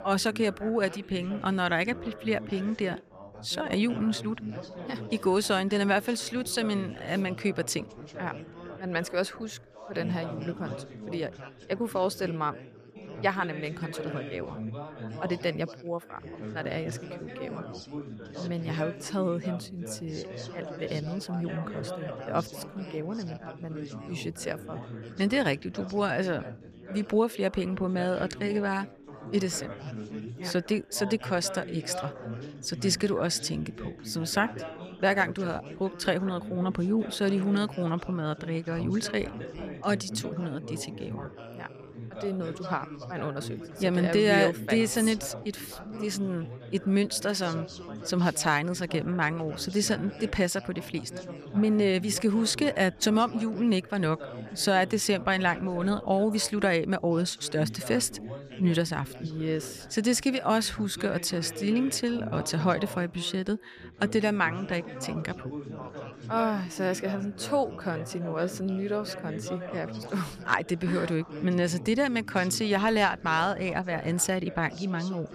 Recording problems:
background chatter; noticeable; throughout; 4 voices, 10 dB below the speech

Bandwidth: 14.5 kHz